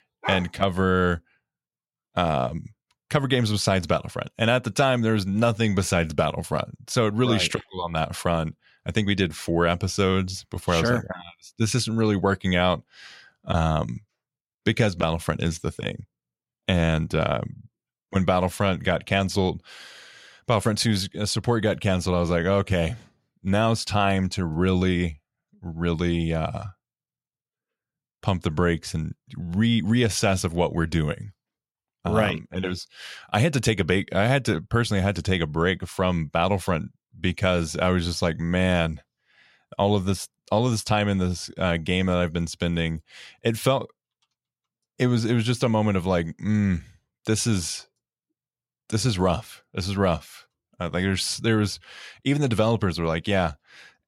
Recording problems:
none

